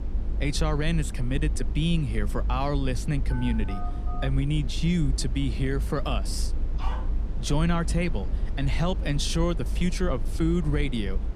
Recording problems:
low rumble; noticeable; throughout; 15 dB below the speech
phone ringing; faint; at 3.5 s; peak 15 dB below the speech
dog barking; faint; at 7 s; peak 10 dB below the speech

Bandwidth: 14.5 kHz